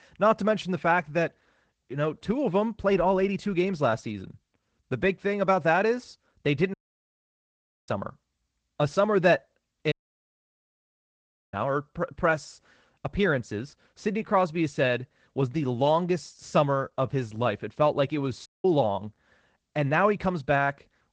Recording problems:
garbled, watery; slightly; nothing above 8 kHz
audio cutting out; at 6.5 s for 1 s, at 10 s for 1.5 s and at 18 s

